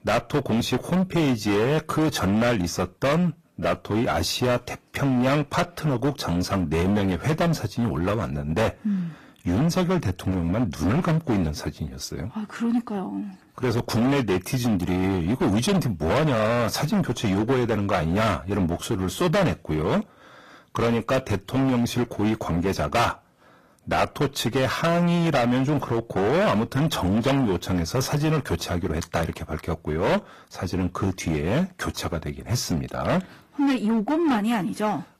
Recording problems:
distortion; heavy; 17% of the sound clipped
garbled, watery; slightly; nothing above 14.5 kHz

